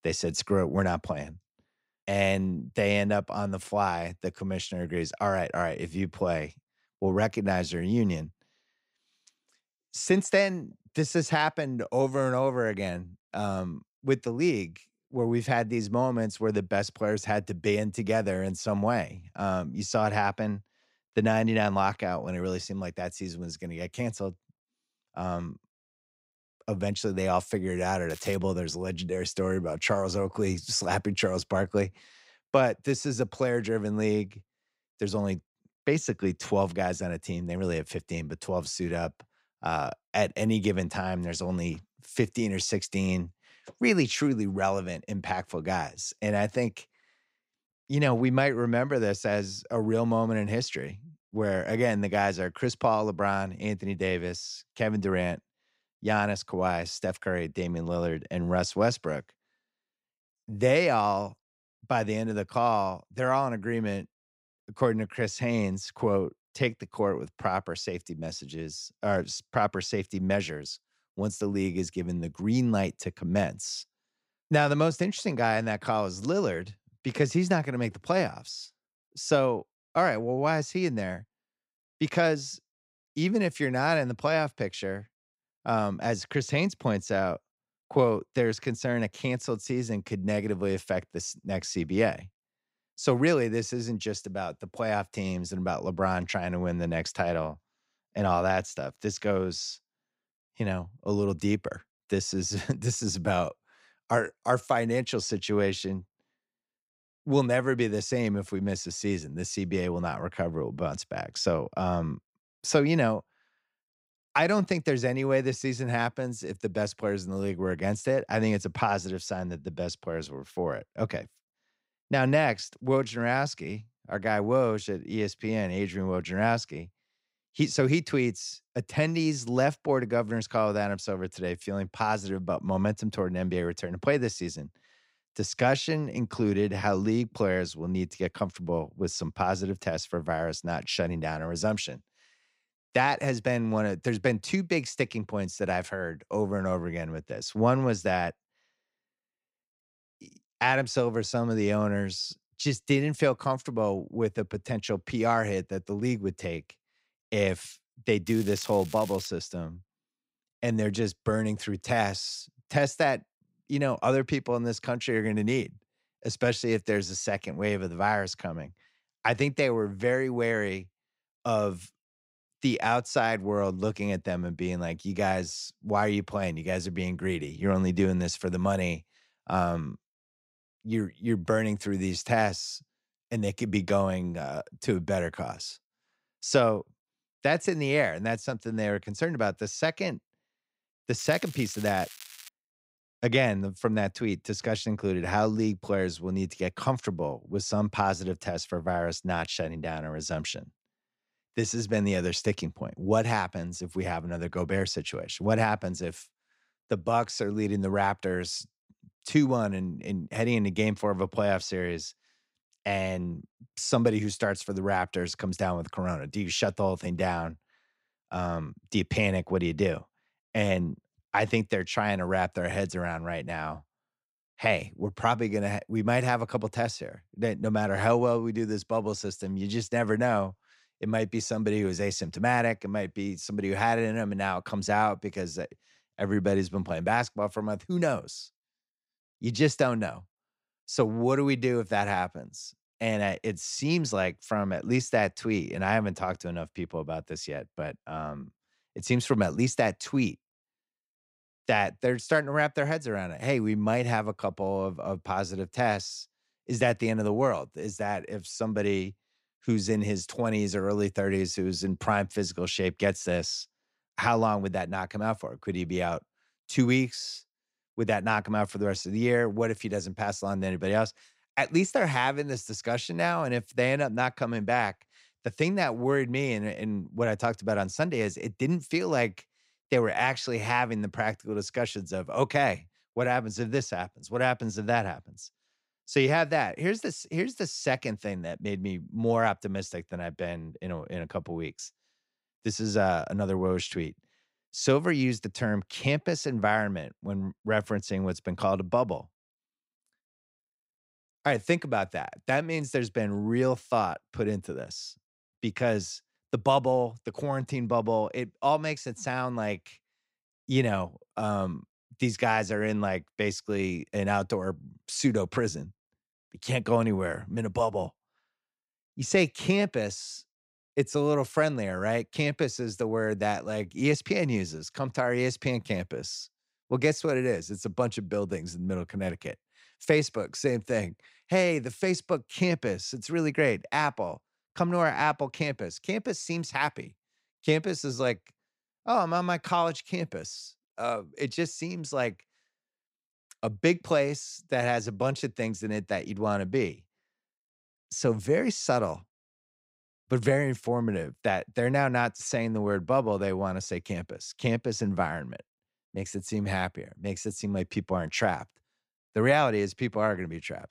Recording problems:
crackling; noticeable; at 28 s, from 2:38 to 2:39 and from 3:11 to 3:12; 15 dB below the speech

